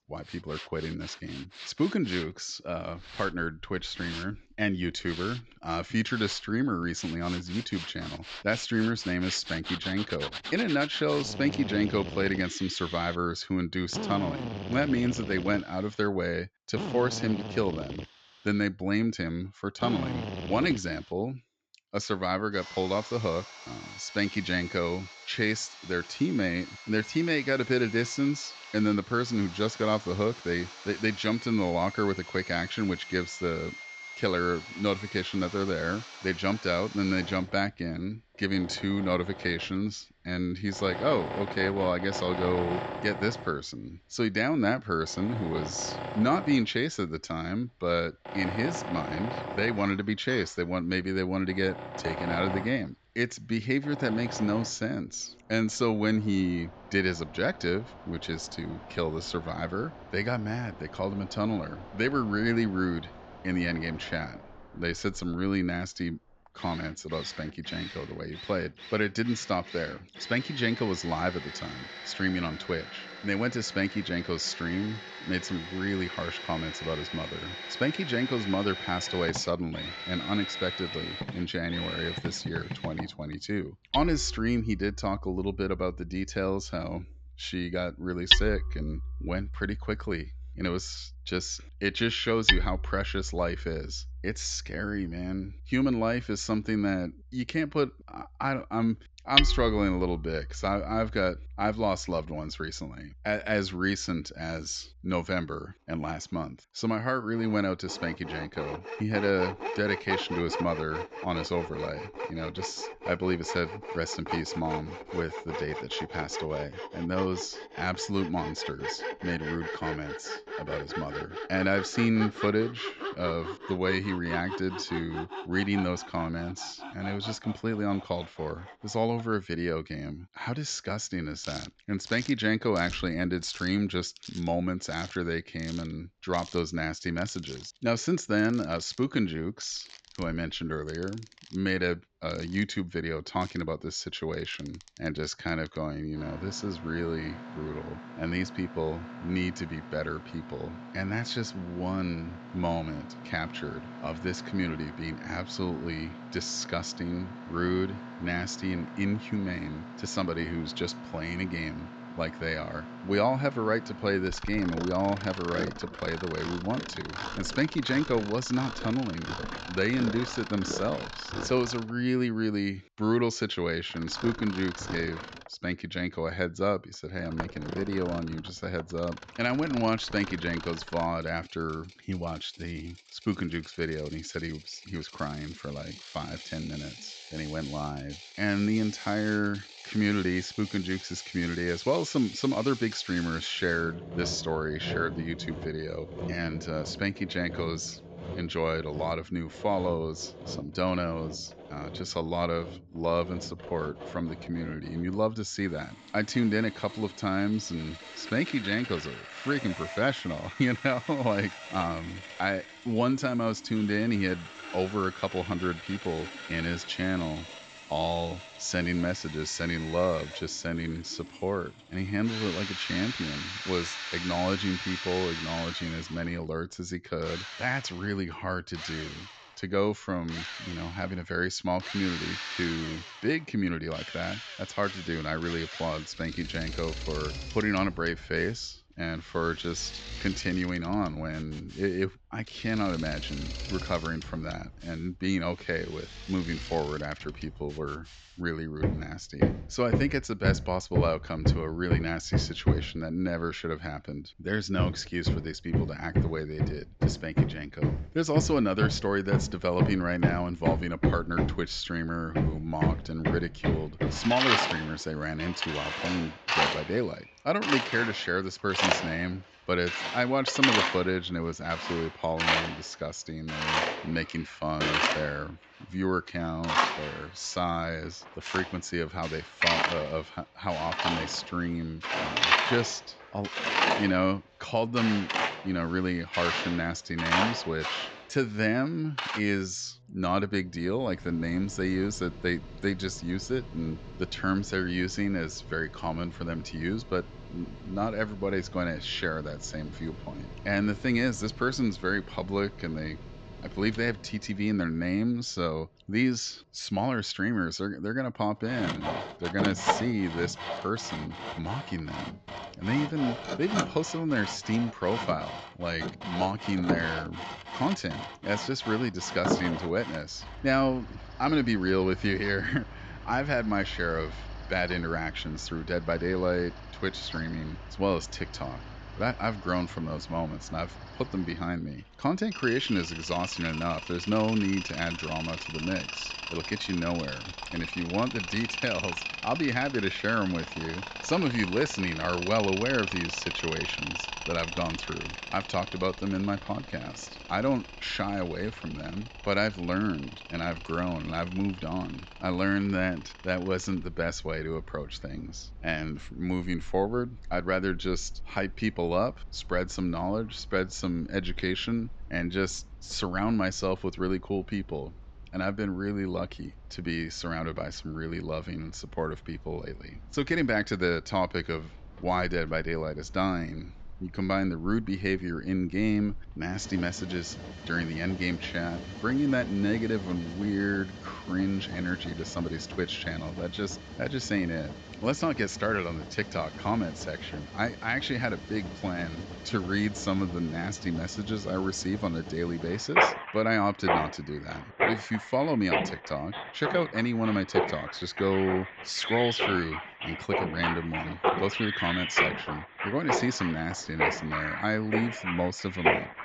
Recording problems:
high frequencies cut off; noticeable; nothing above 8 kHz
machinery noise; loud; throughout; 5 dB below the speech

